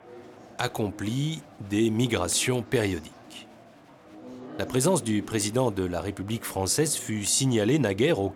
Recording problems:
chatter from many people; noticeable; throughout; 20 dB below the speech

